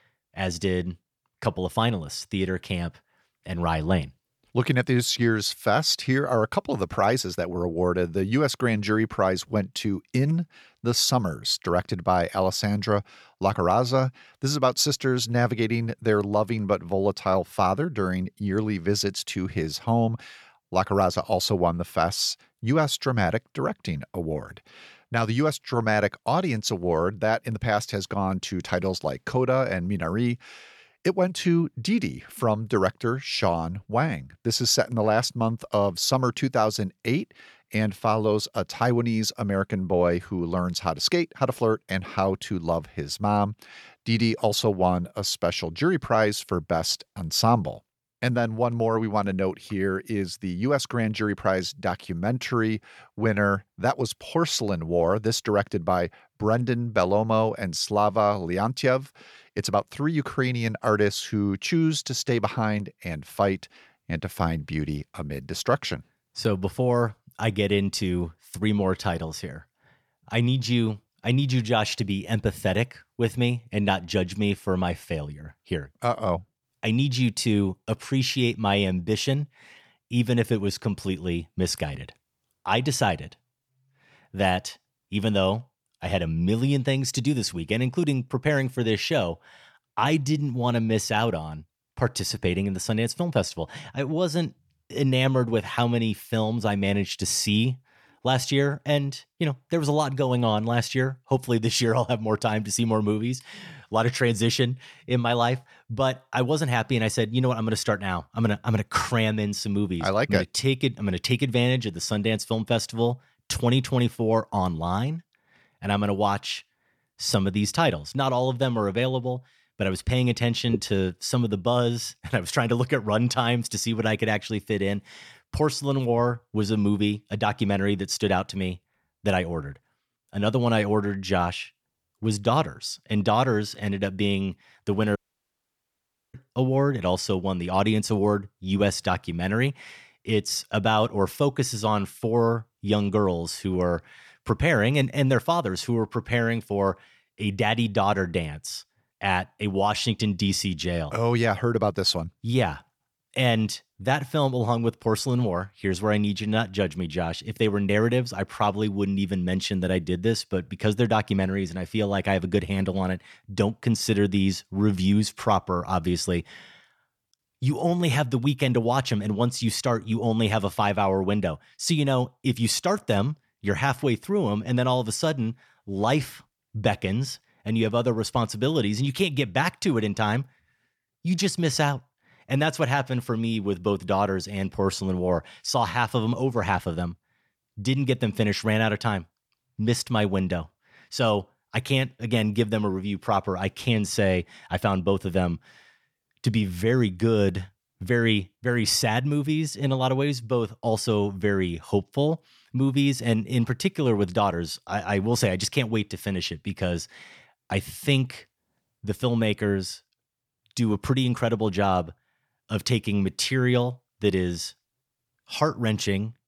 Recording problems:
audio cutting out; at 2:15 for 1 s

